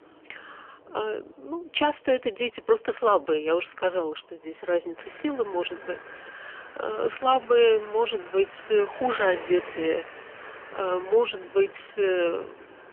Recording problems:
phone-call audio; poor line; nothing above 3 kHz
traffic noise; noticeable; throughout; 20 dB below the speech

